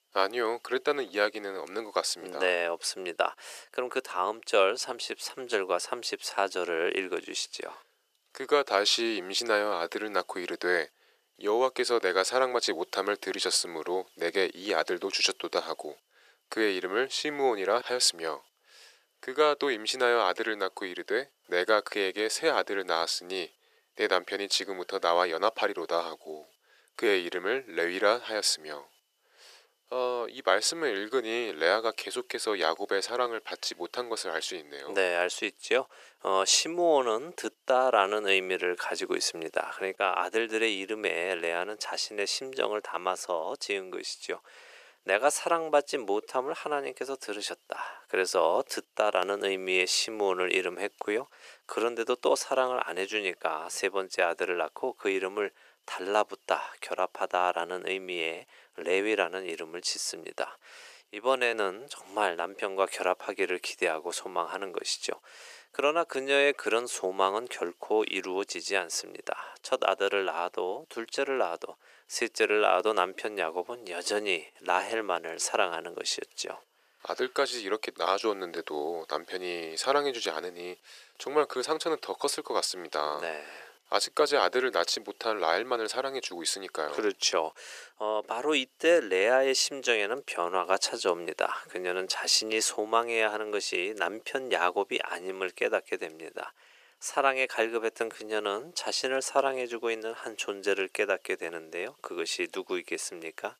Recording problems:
thin; very; fading below 400 Hz

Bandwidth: 14.5 kHz